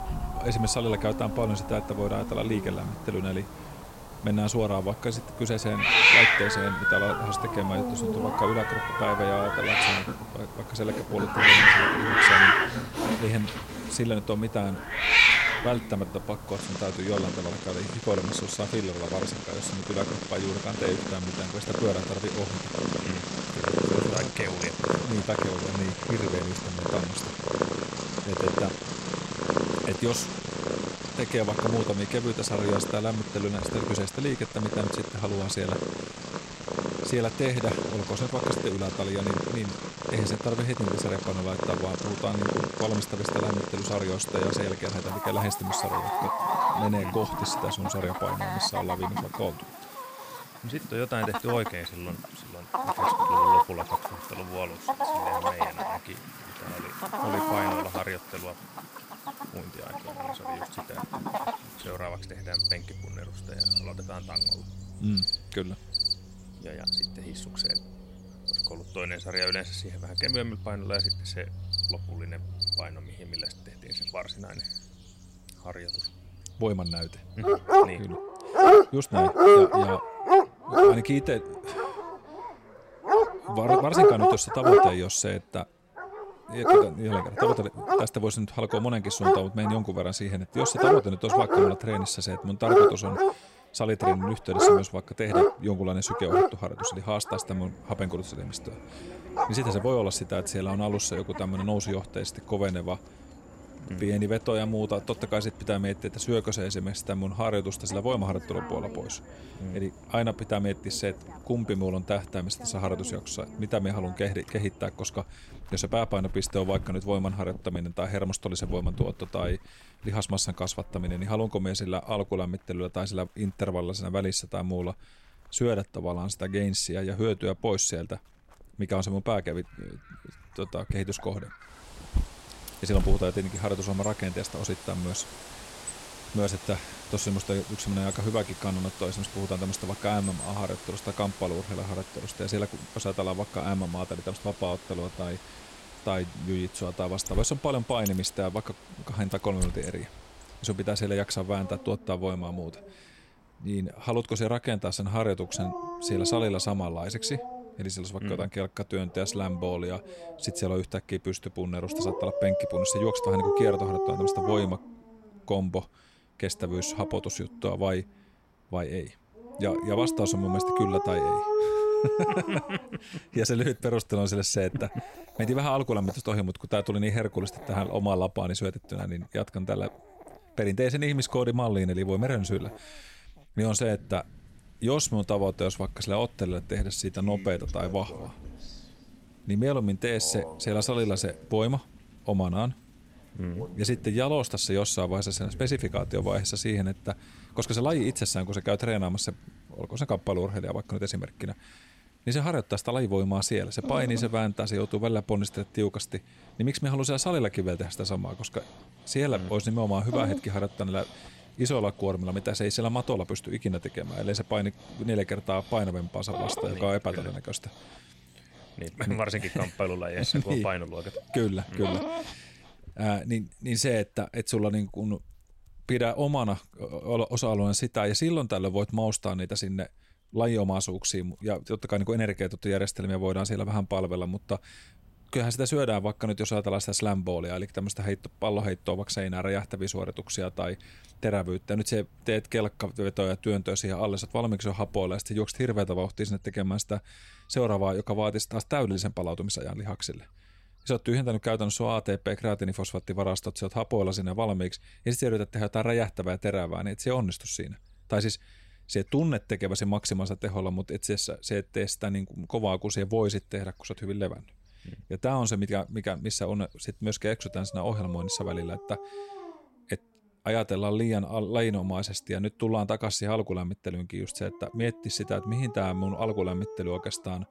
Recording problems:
animal sounds; very loud; throughout; 4 dB above the speech

